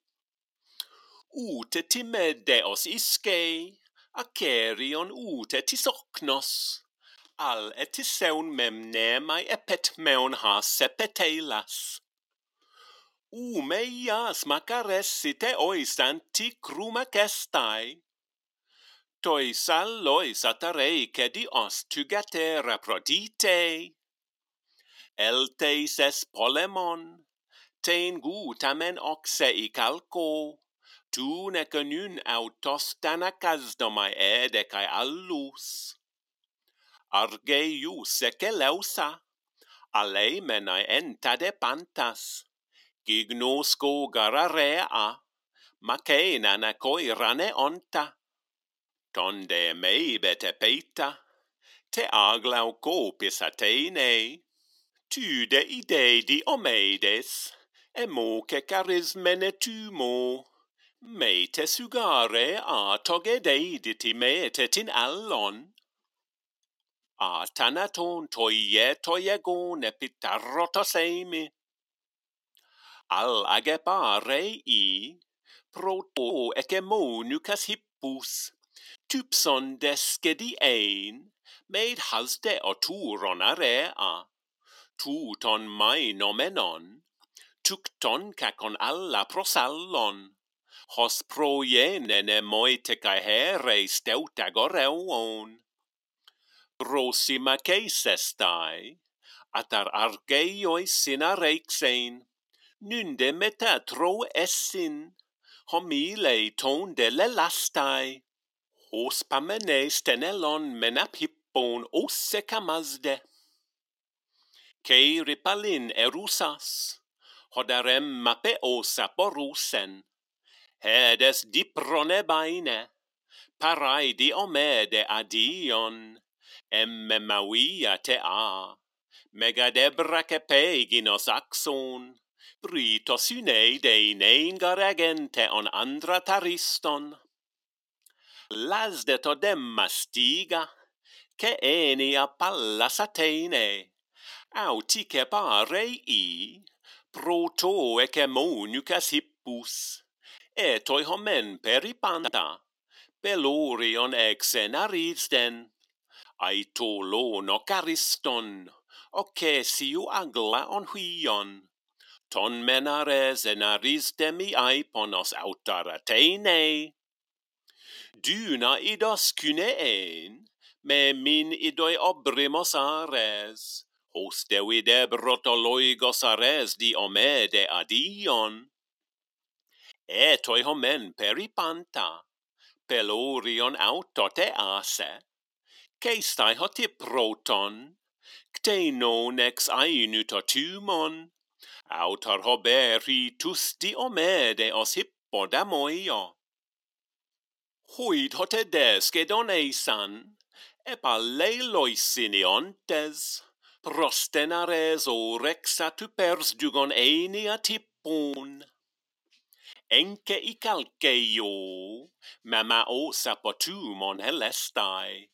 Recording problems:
thin; very slightly; fading below 250 Hz

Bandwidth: 16.5 kHz